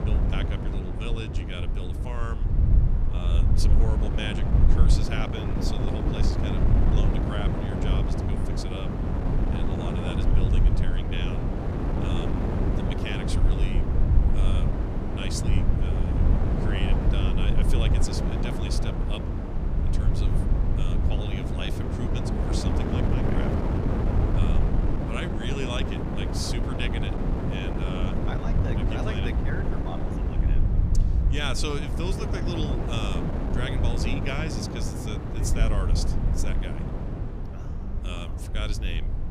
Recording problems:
wind noise on the microphone; heavy; as loud as the speech
low rumble; loud; throughout; 9 dB below the speech

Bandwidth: 14.5 kHz